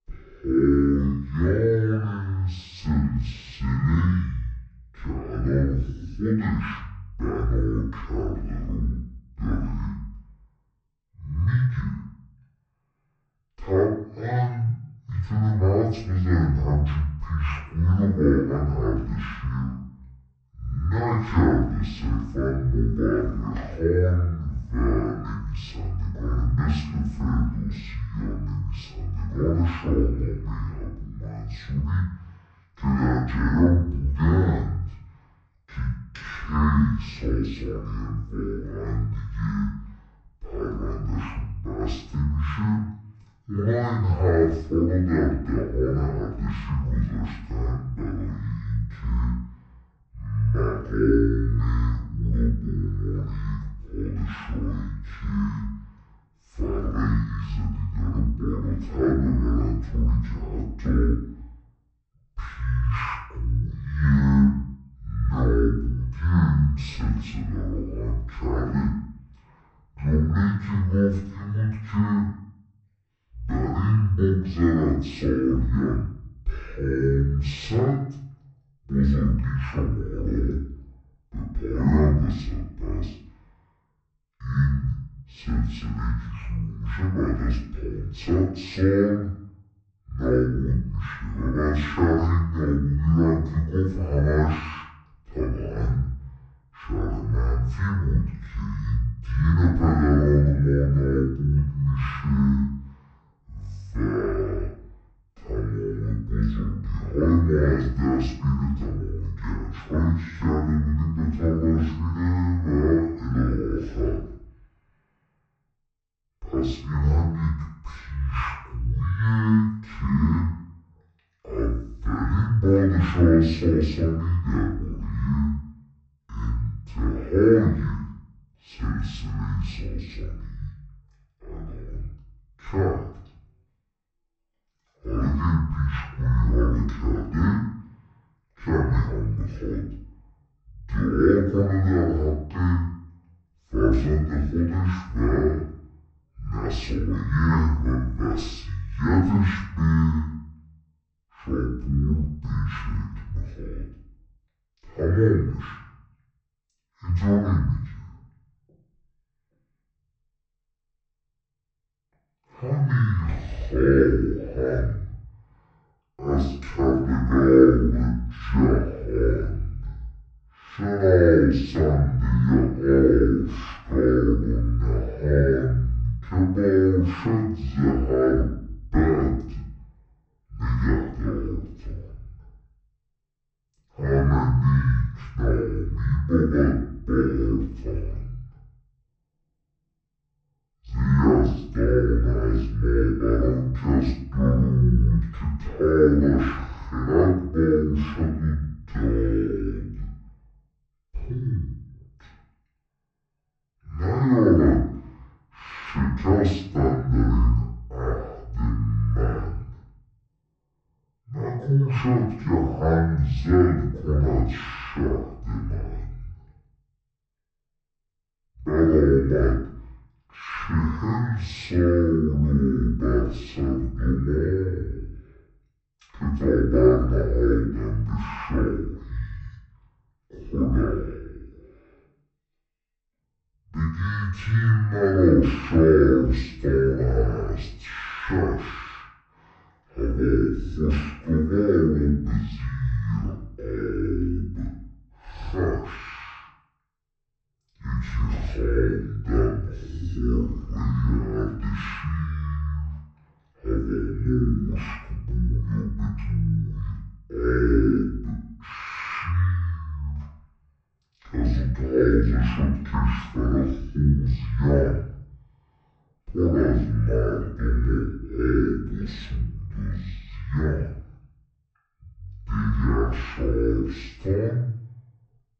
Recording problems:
off-mic speech; far
wrong speed and pitch; too slow and too low; 0.5 times normal speed
room echo; noticeable; dies away in 0.5 s

